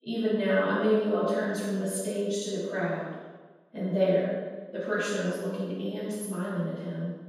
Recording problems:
room echo; strong; dies away in 1.2 s
off-mic speech; far

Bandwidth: 15.5 kHz